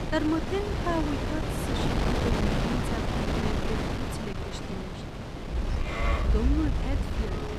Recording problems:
animal sounds; very loud; from 5.5 s on; 4 dB above the speech
wind noise on the microphone; heavy; 2 dB above the speech

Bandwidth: 14.5 kHz